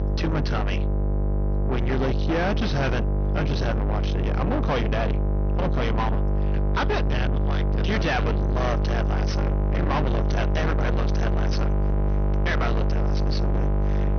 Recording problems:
distortion; heavy; 7 dB below the speech
high frequencies cut off; noticeable; nothing above 6.5 kHz
electrical hum; loud; throughout; 50 Hz, 3 dB below the speech

